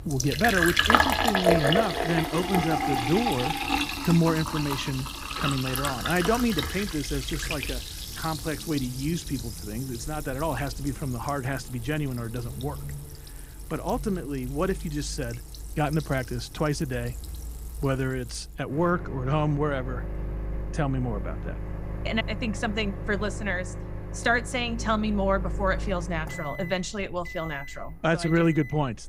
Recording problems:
household noises; loud; throughout; 2 dB below the speech

